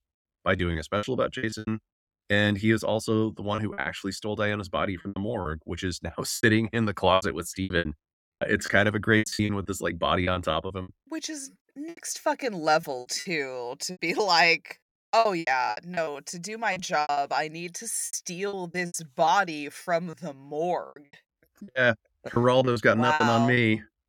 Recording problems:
choppy; very; 14% of the speech affected

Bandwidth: 18 kHz